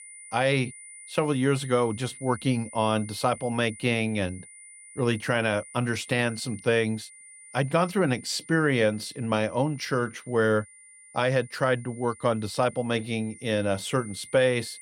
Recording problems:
high-pitched whine; noticeable; throughout; 9.5 kHz, 20 dB below the speech

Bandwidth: 16.5 kHz